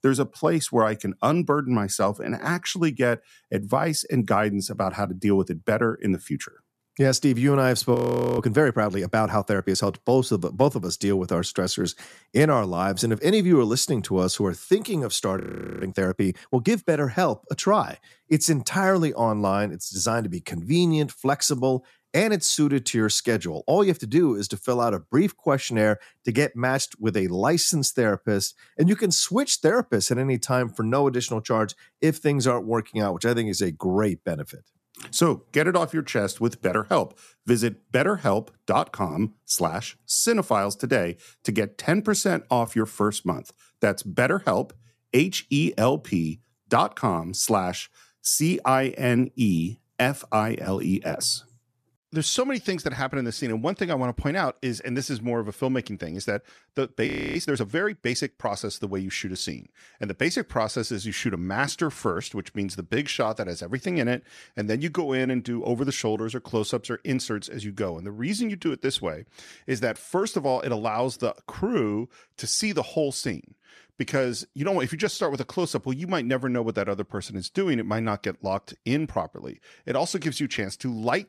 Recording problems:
audio freezing; at 8 s, at 15 s and at 57 s

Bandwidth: 14 kHz